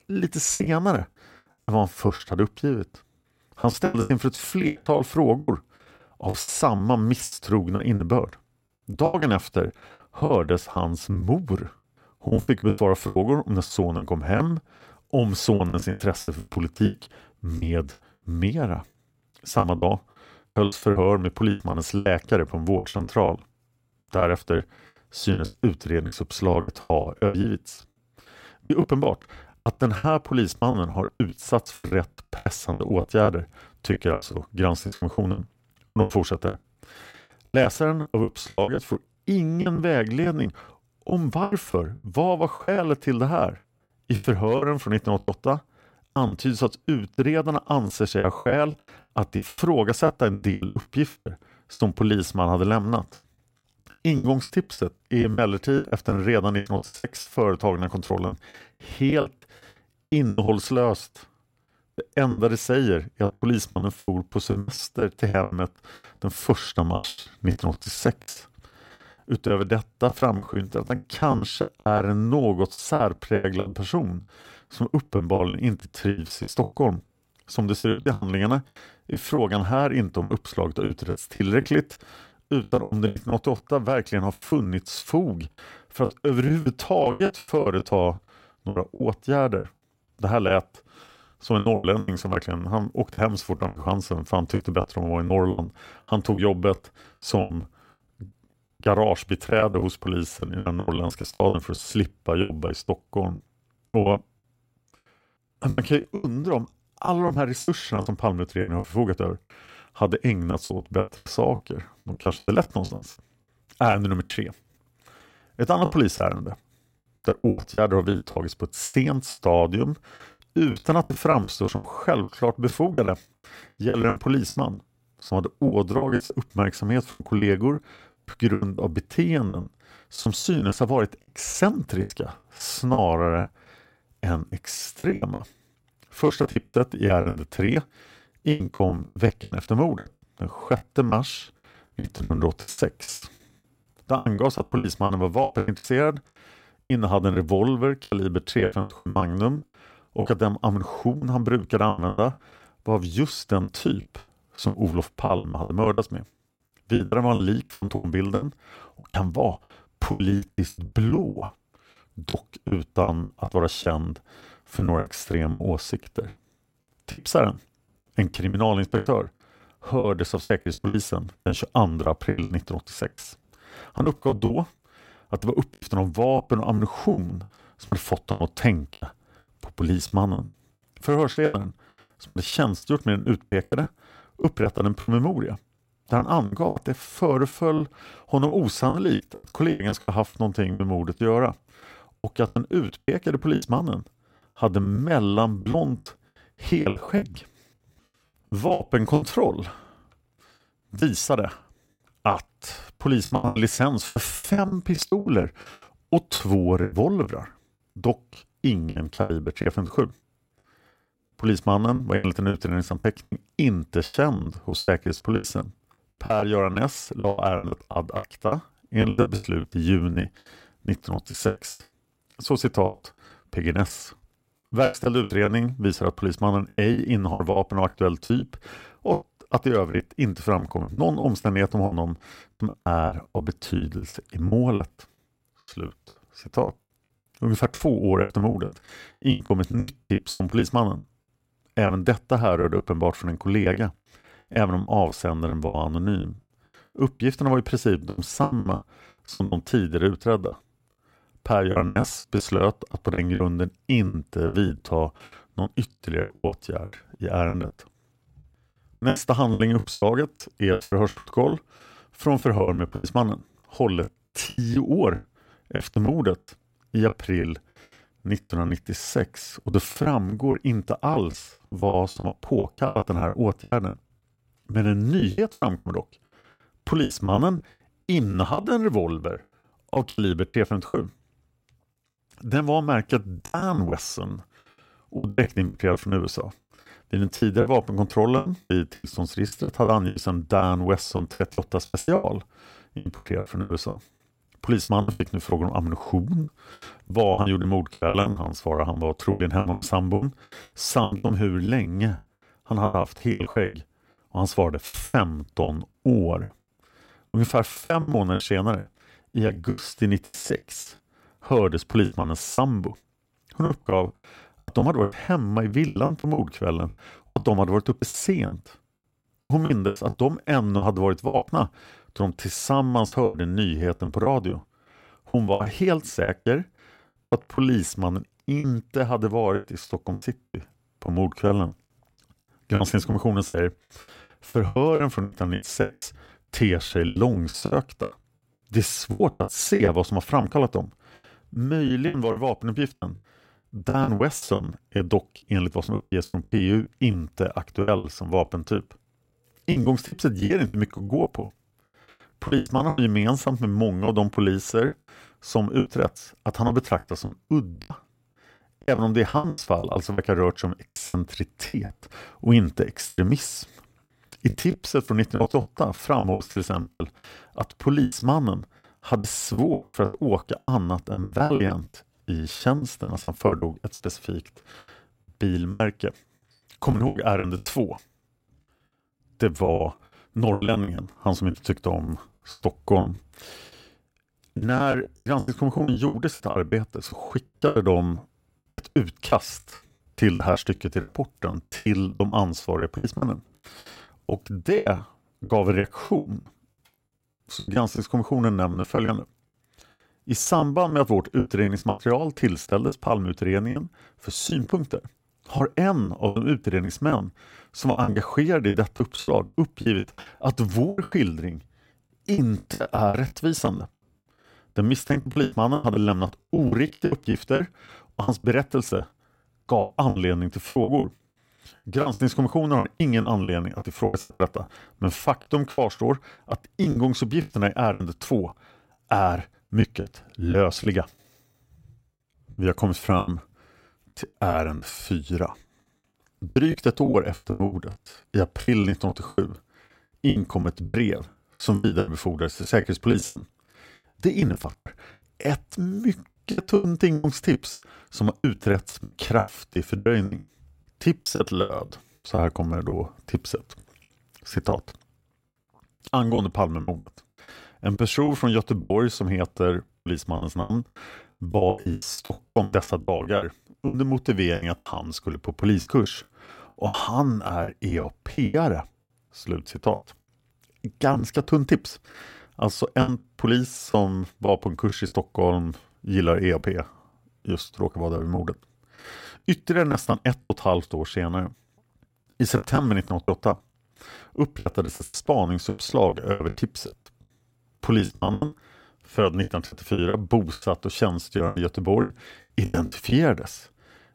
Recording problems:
choppy; very; 16% of the speech affected

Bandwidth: 16 kHz